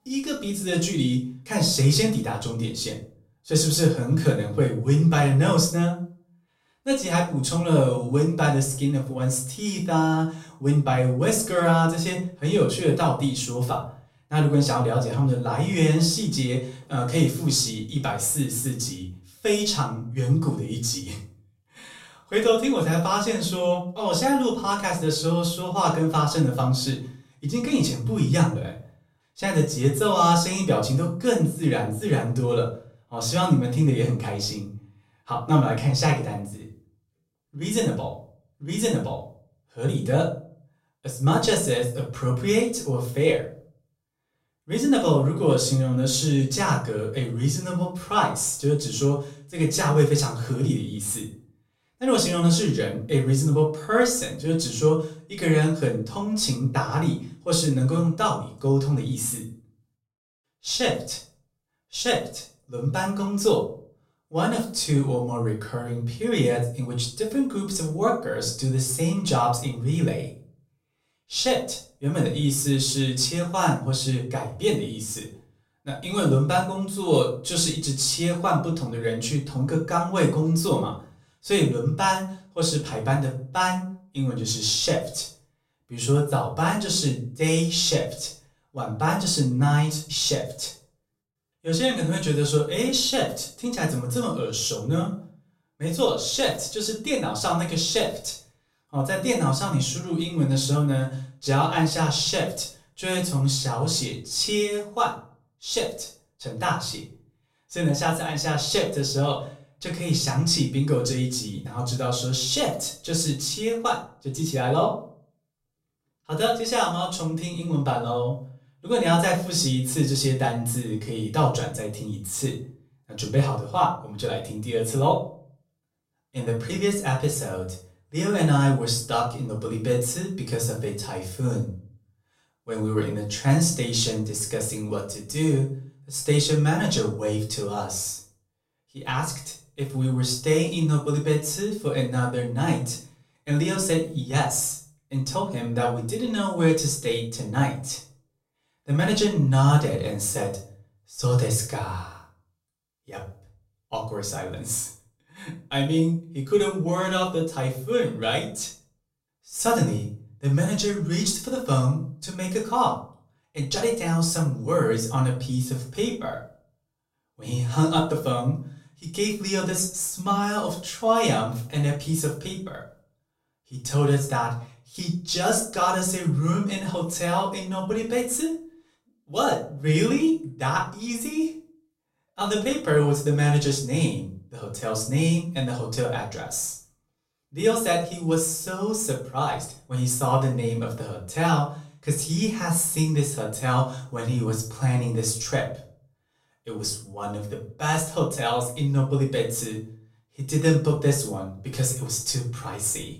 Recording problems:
off-mic speech; far
room echo; slight; dies away in 0.4 s

